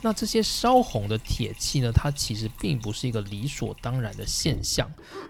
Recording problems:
household noises; noticeable; throughout; 15 dB below the speech

